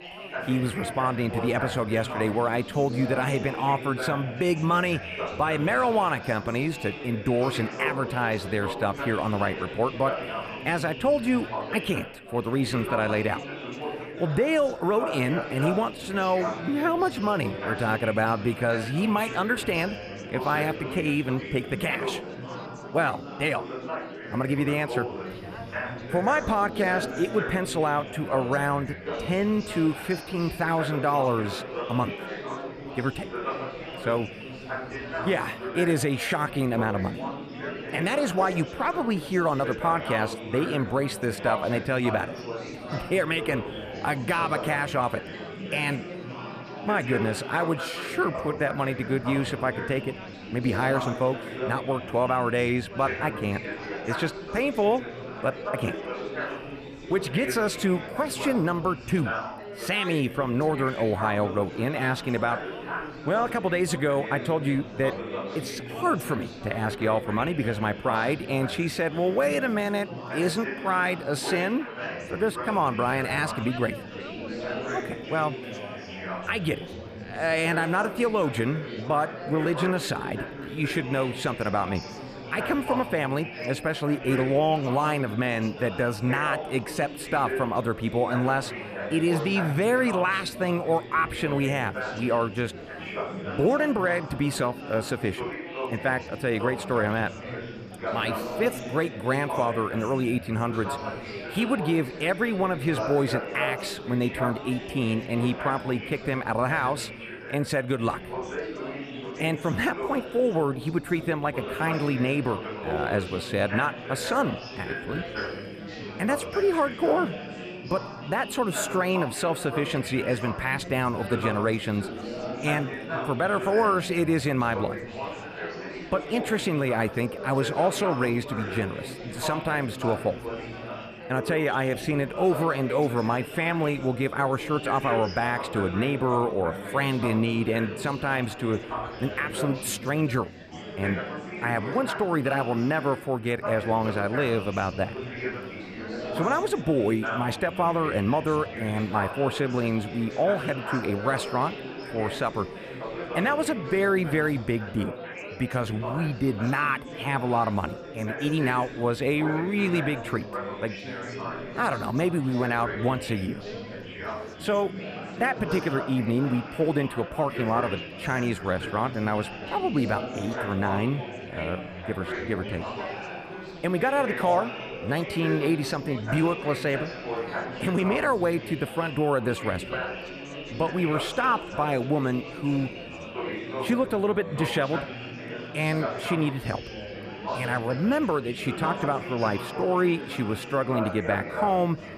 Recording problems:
chatter from many people; loud; throughout; 8 dB below the speech

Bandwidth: 14.5 kHz